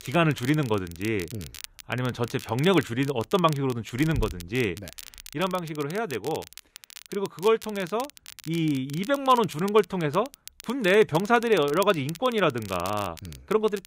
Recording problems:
crackle, like an old record; noticeable; 15 dB below the speech

